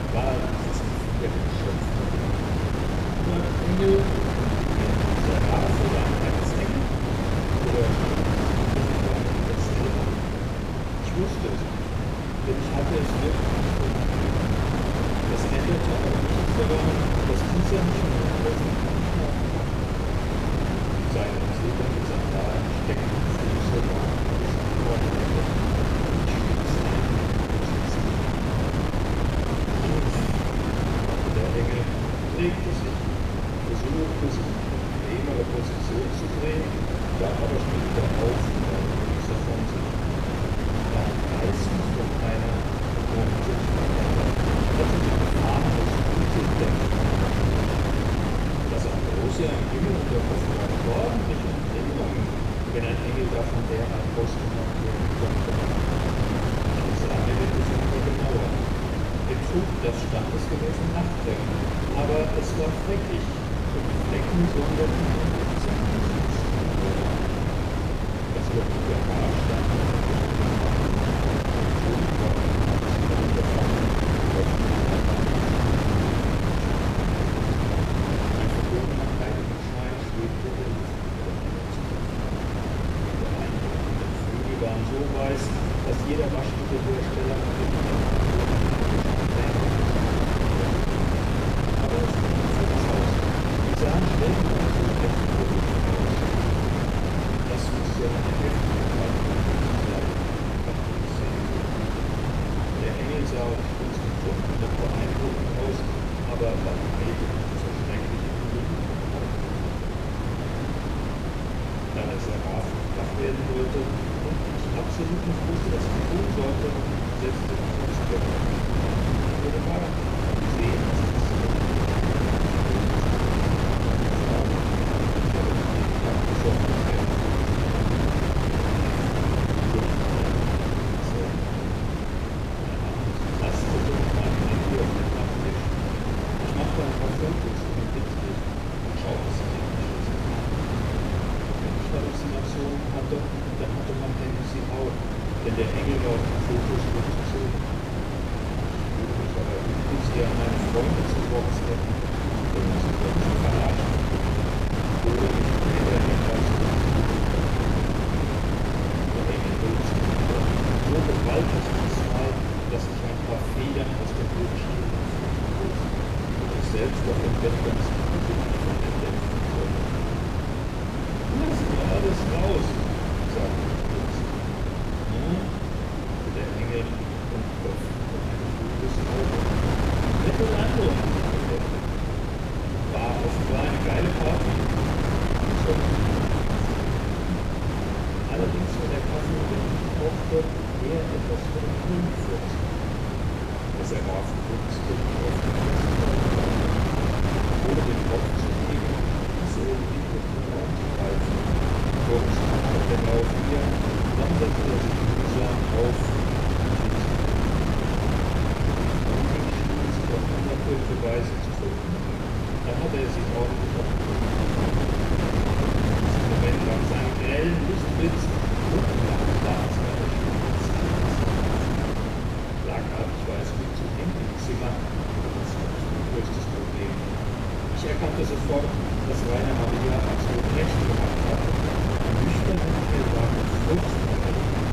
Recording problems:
off-mic speech; far
room echo; noticeable; dies away in 1 s
wind noise on the microphone; heavy; 4 dB above the speech

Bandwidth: 15 kHz